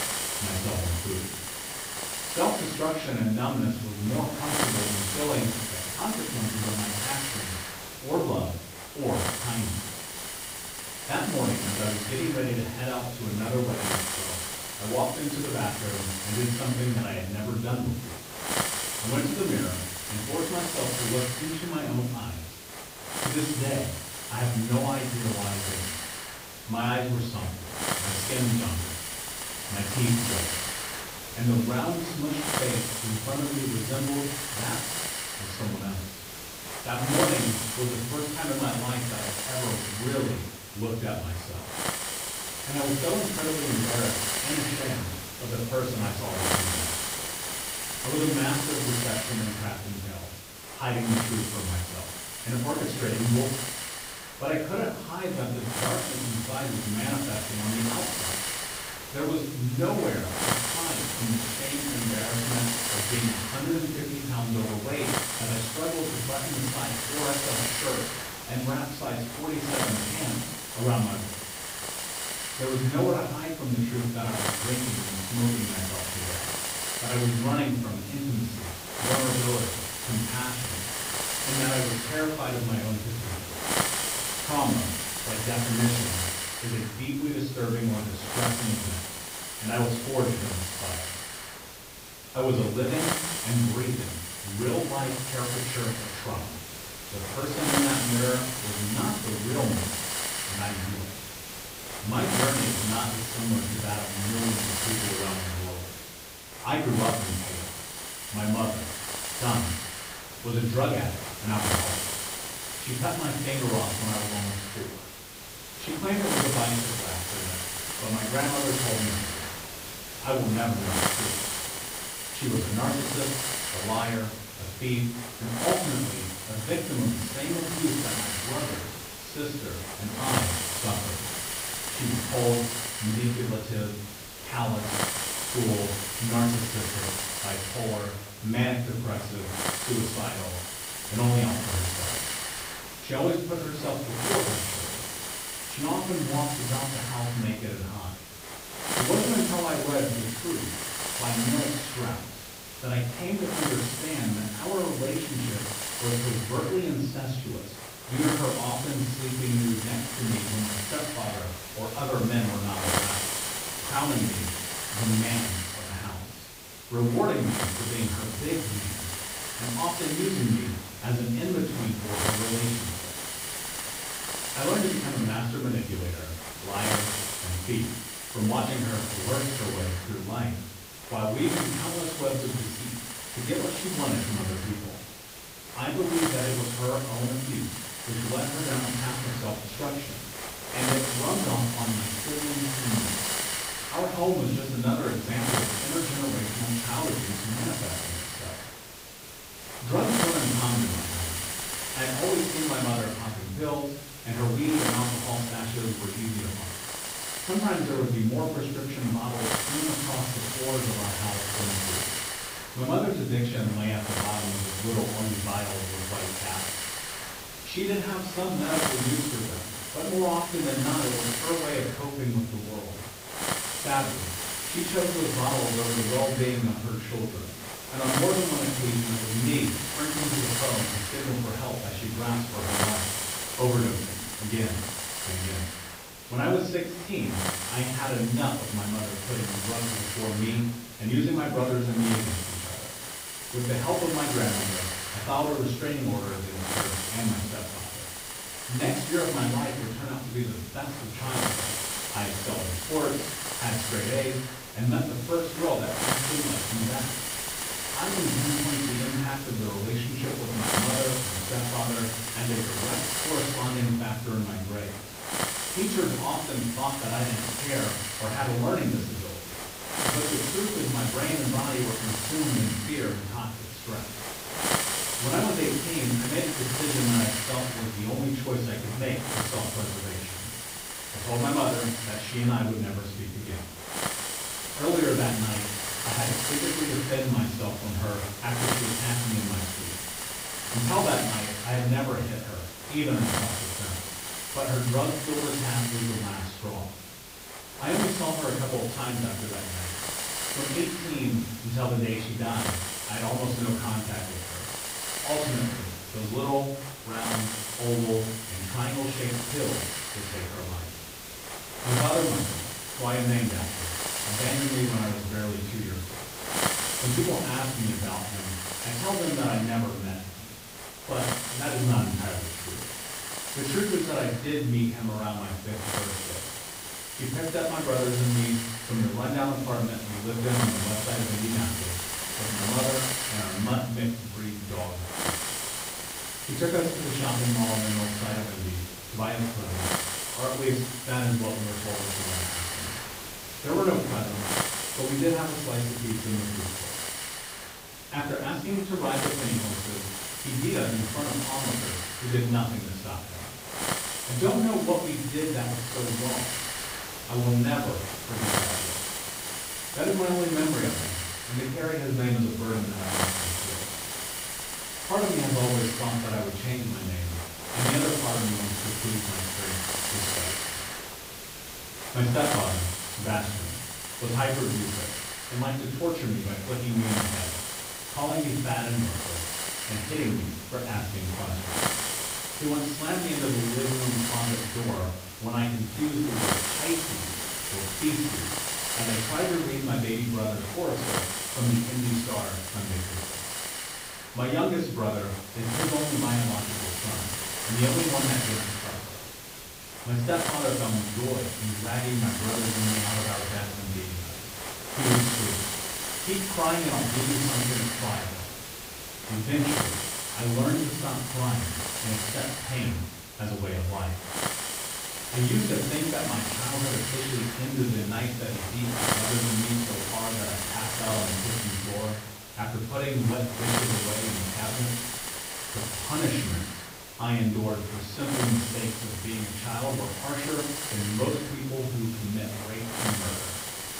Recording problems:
off-mic speech; far
room echo; noticeable; dies away in 0.5 s
garbled, watery; slightly
hiss; loud; throughout; 1 dB below the speech

